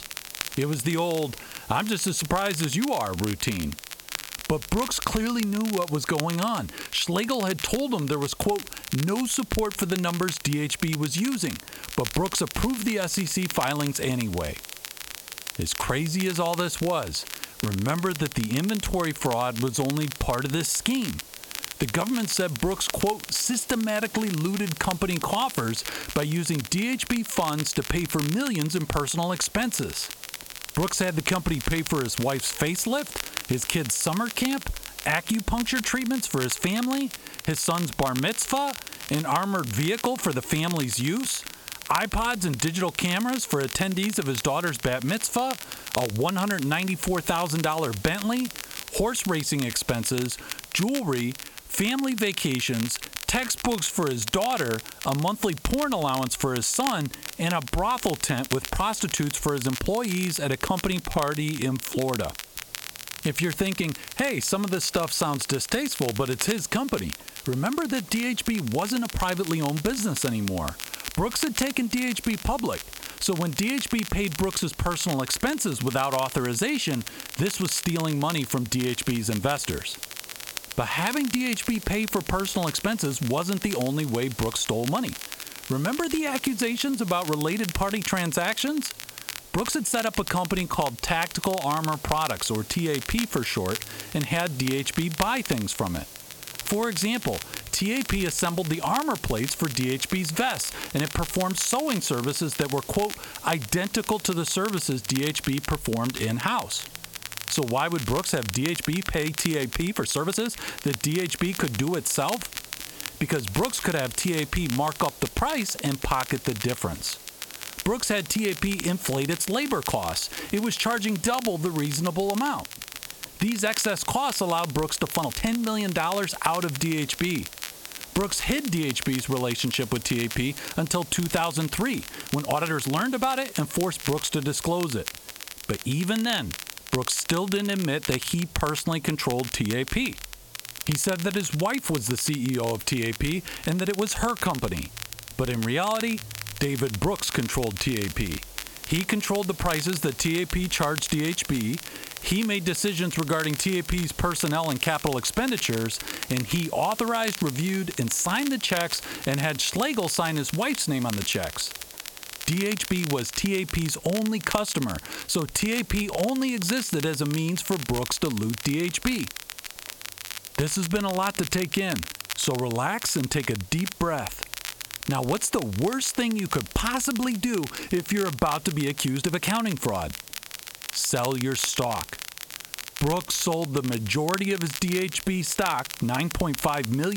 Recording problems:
squashed, flat; heavily
crackle, like an old record; loud; 10 dB below the speech
hiss; noticeable; throughout; 15 dB below the speech
uneven, jittery; strongly; from 17 s to 3:06
abrupt cut into speech; at the end

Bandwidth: 17 kHz